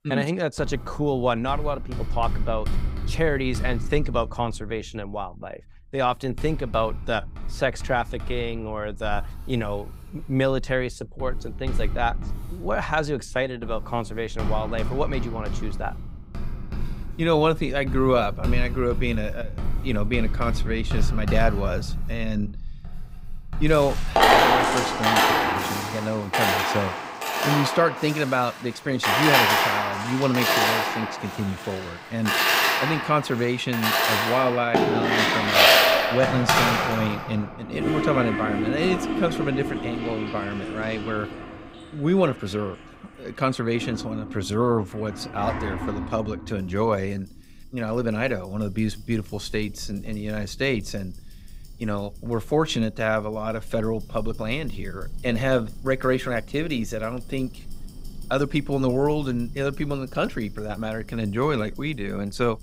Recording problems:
household noises; very loud; throughout; 2 dB above the speech

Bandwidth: 15.5 kHz